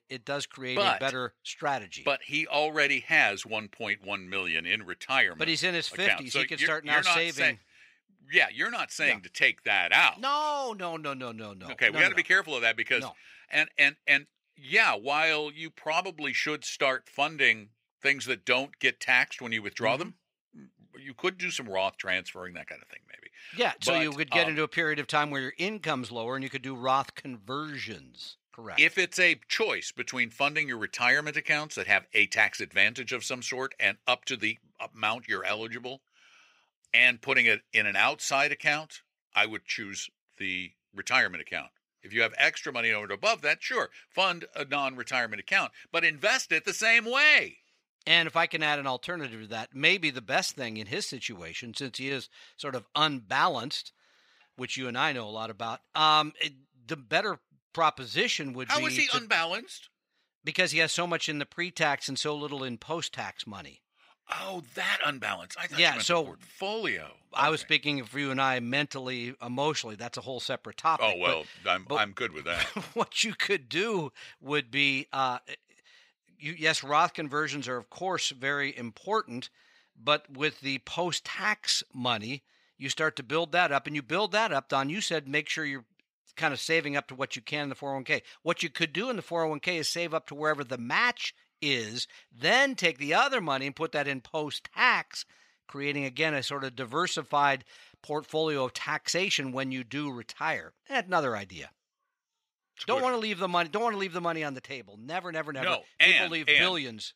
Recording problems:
thin; very slightly; fading below 500 Hz

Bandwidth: 15.5 kHz